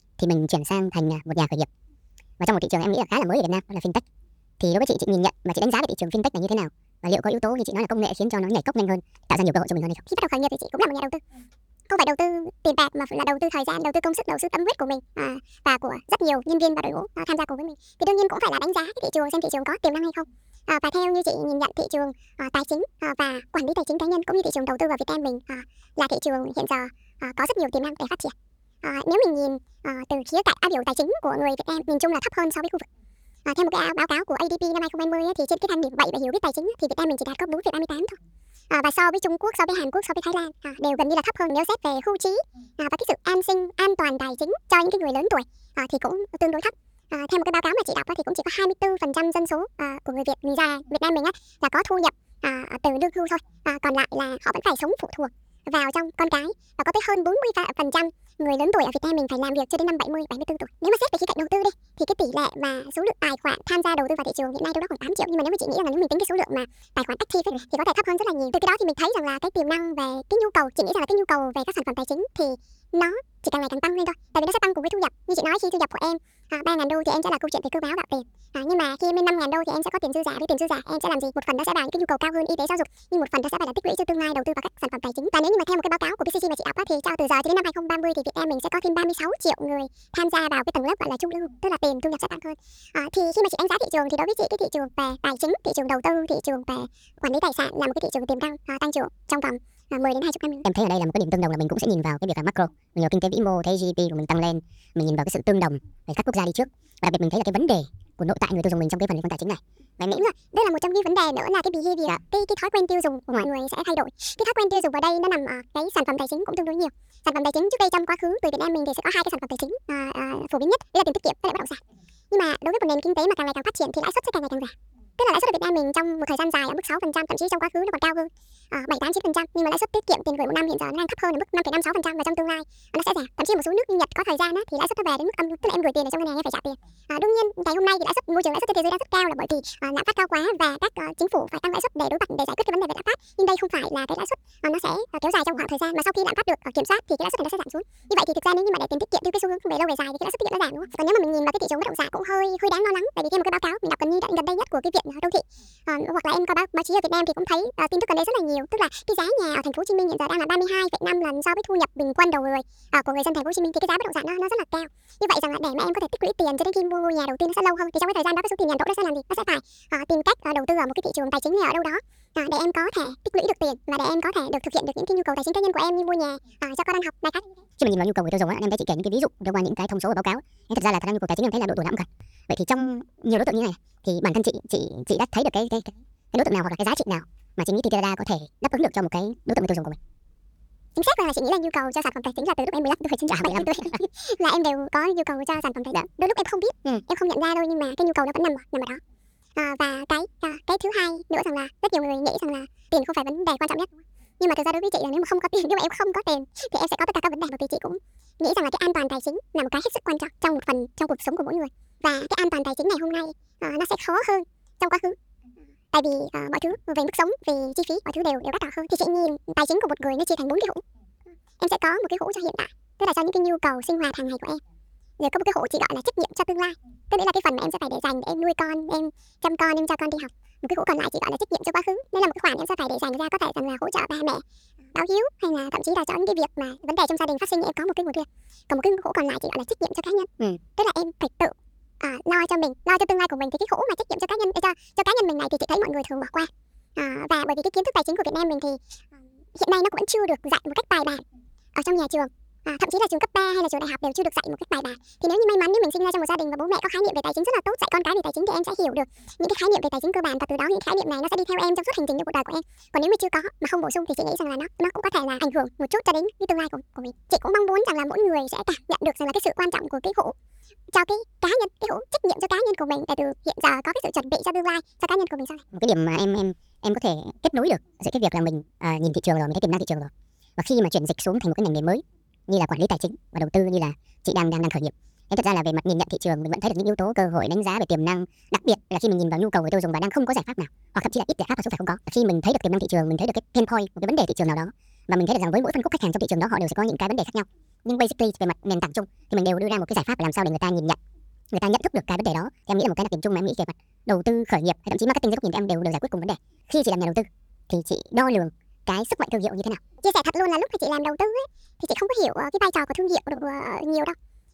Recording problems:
wrong speed and pitch; too fast and too high; 1.6 times normal speed

